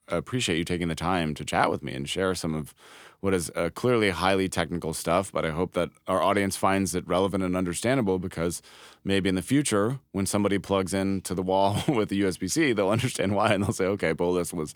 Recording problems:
none

